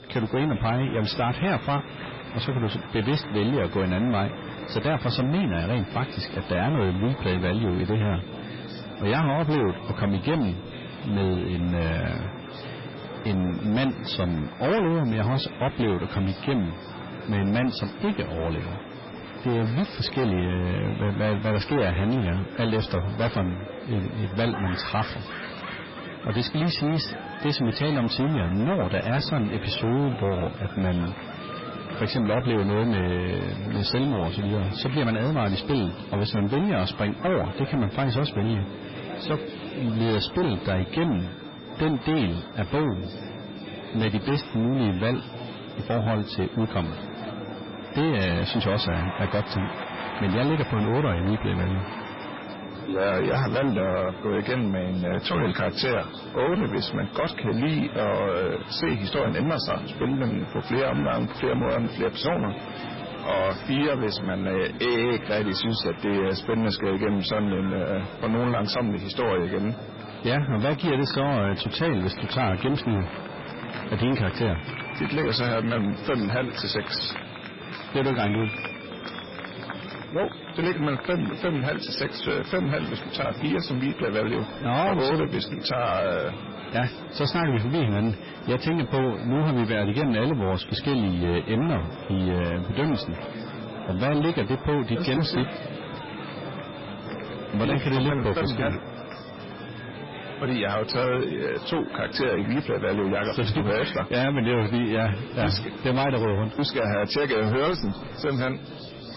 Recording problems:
distortion; heavy; 19% of the sound clipped
garbled, watery; badly; nothing above 5.5 kHz
murmuring crowd; noticeable; throughout; 10 dB below the speech
high-pitched whine; faint; throughout; 3.5 kHz, 25 dB below the speech

